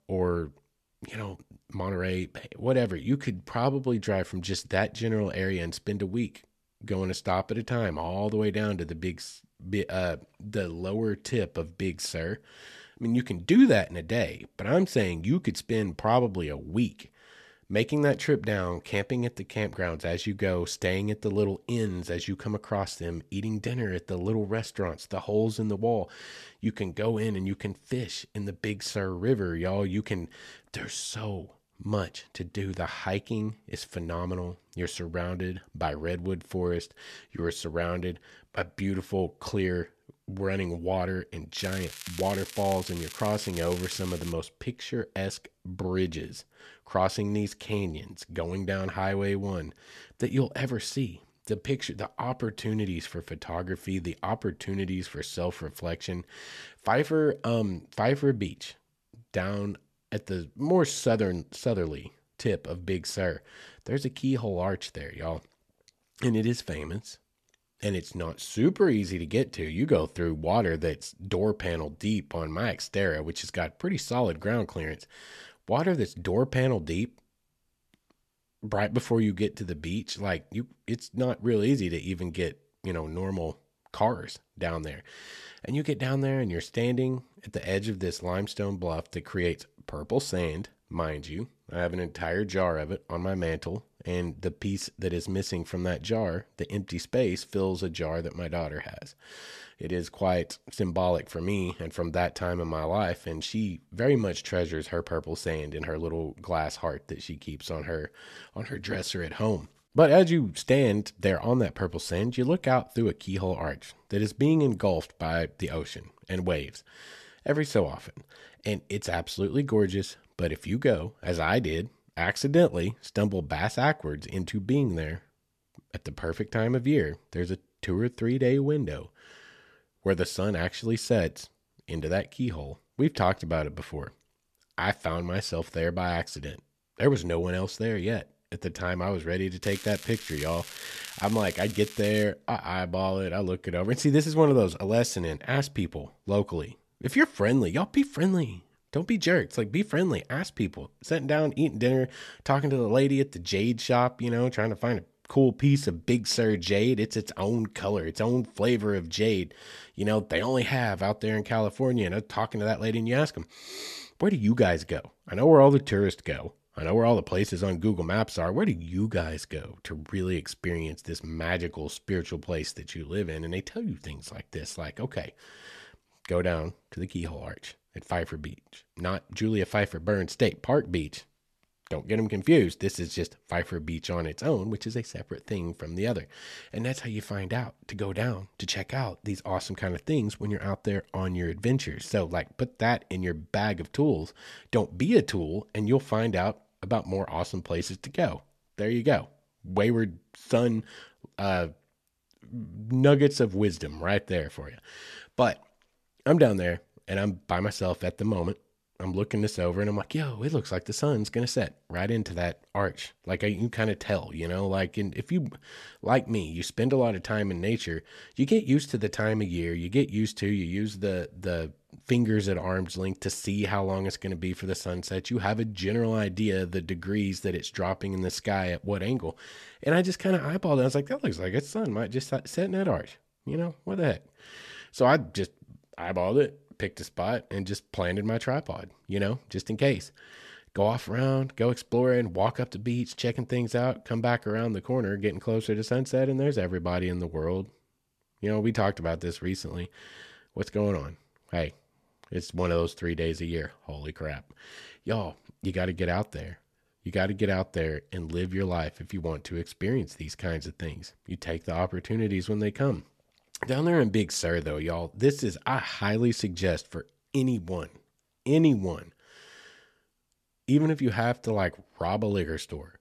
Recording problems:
crackling; noticeable; from 42 to 44 s and from 2:20 to 2:22; 10 dB below the speech

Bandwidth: 13.5 kHz